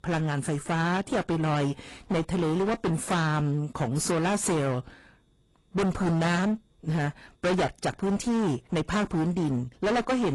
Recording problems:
distortion; heavy; 24% of the sound clipped
garbled, watery; slightly; nothing above 11.5 kHz
abrupt cut into speech; at the end

